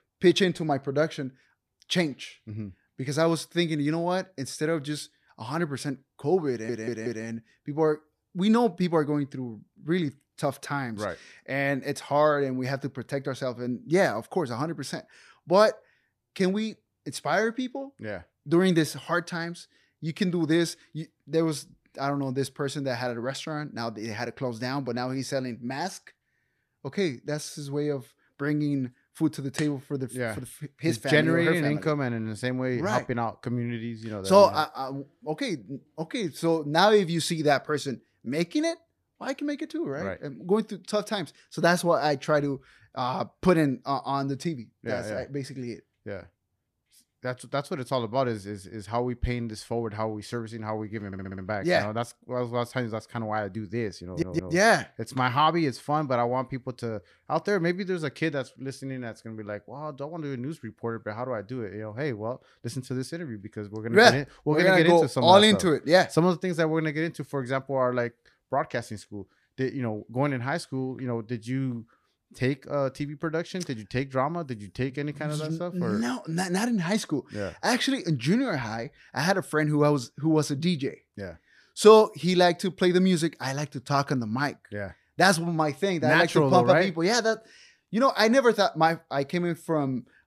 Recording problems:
audio stuttering; at 6.5 s, at 51 s and at 54 s

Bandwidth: 14.5 kHz